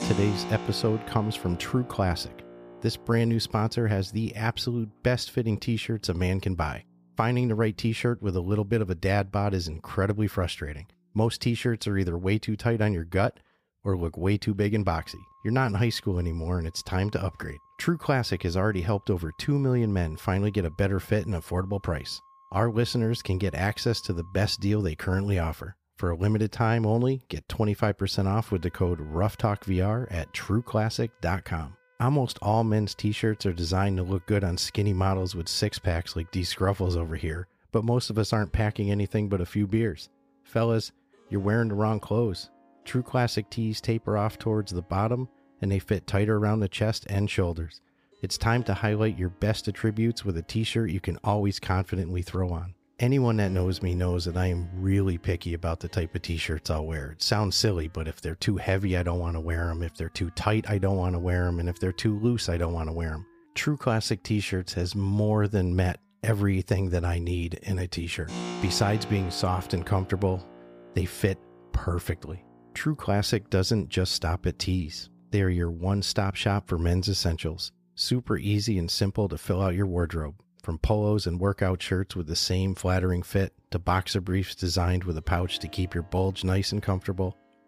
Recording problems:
background music; noticeable; throughout; 20 dB below the speech

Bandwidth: 15 kHz